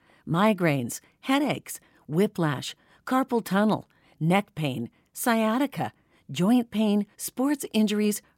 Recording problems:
none

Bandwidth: 16.5 kHz